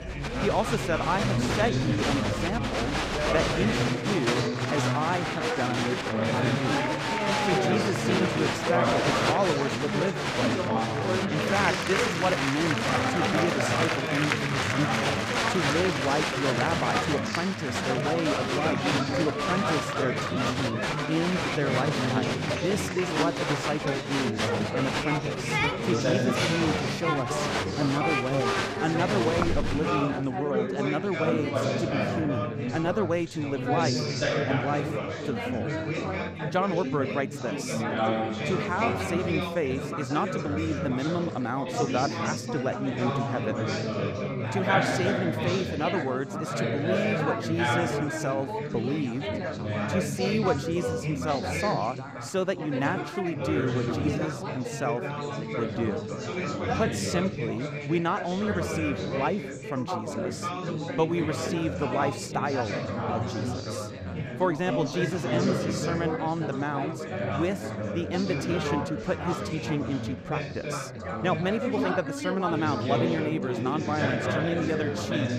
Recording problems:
chatter from many people; very loud; throughout; 2 dB above the speech

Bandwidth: 15.5 kHz